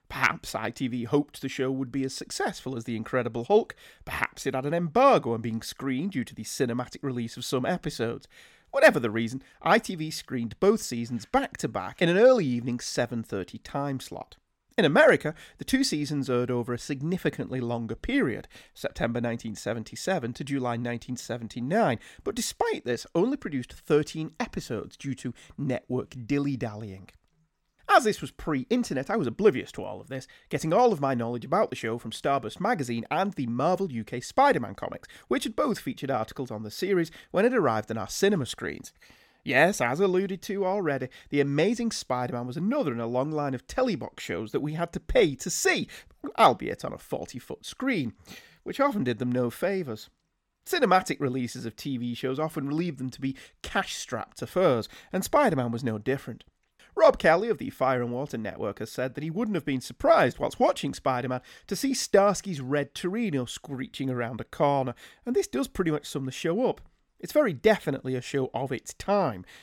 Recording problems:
none

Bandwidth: 17 kHz